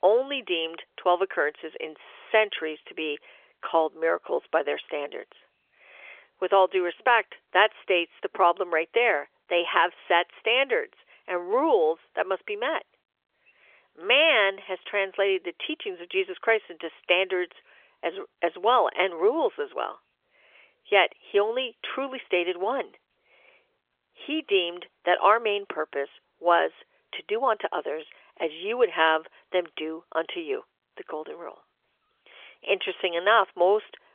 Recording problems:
phone-call audio; nothing above 3.5 kHz

